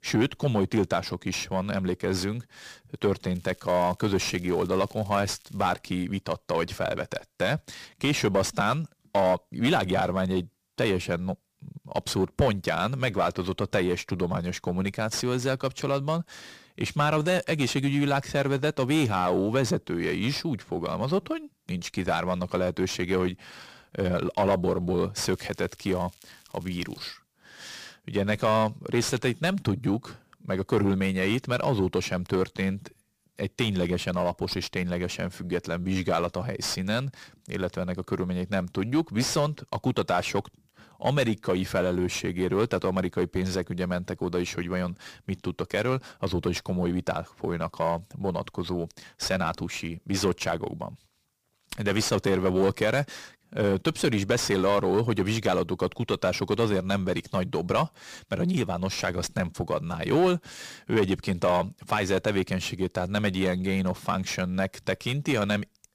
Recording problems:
distortion; slight; 10 dB below the speech
crackling; faint; from 3.5 to 5.5 s and from 25 to 27 s; 25 dB below the speech

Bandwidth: 15 kHz